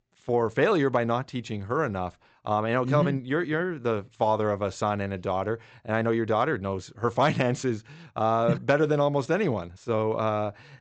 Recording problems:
high frequencies cut off; noticeable; nothing above 8 kHz

